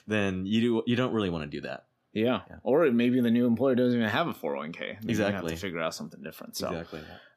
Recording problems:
none

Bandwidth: 14.5 kHz